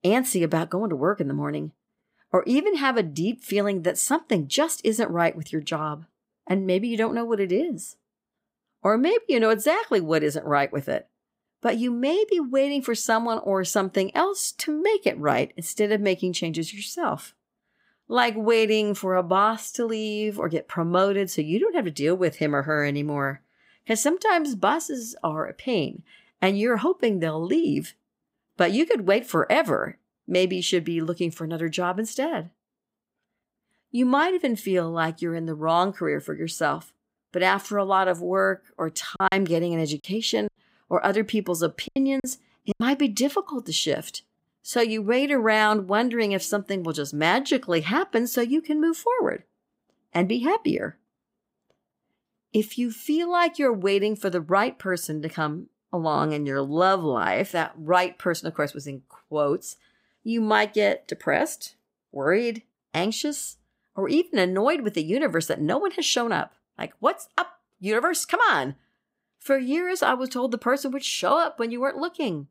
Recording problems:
choppy; very; from 39 to 43 s; 12% of the speech affected

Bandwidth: 15.5 kHz